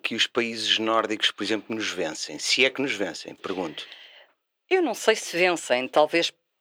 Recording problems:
thin; somewhat; fading below 500 Hz

